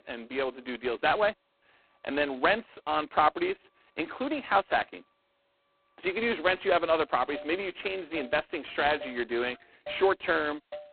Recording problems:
phone-call audio; poor line; nothing above 4 kHz
traffic noise; noticeable; throughout; 20 dB below the speech

